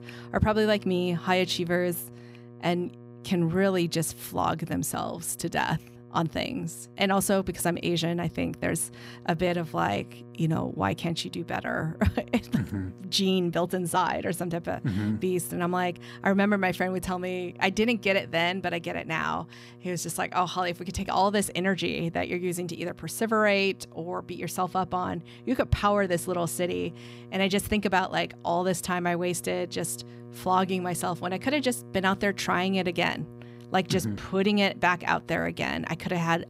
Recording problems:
electrical hum; faint; throughout; 60 Hz, 25 dB below the speech

